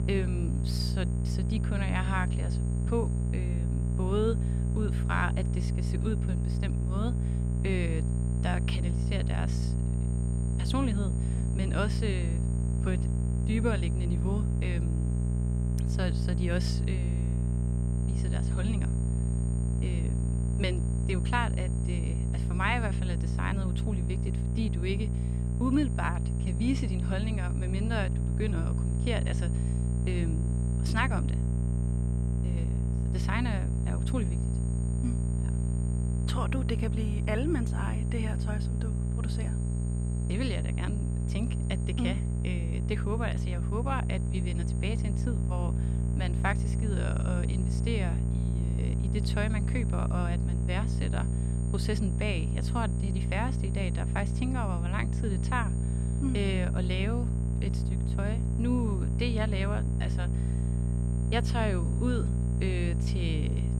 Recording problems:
electrical hum; loud; throughout; 60 Hz, 5 dB below the speech
high-pitched whine; noticeable; throughout; 8.5 kHz, 15 dB below the speech

